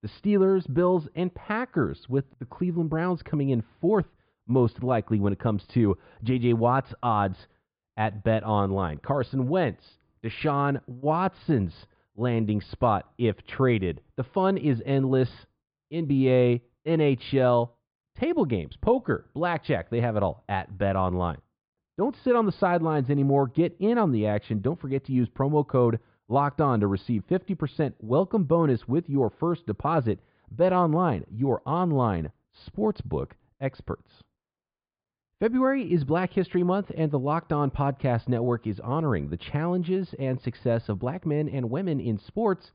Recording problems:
high frequencies cut off; severe; nothing above 5 kHz
muffled; very slightly; fading above 2.5 kHz

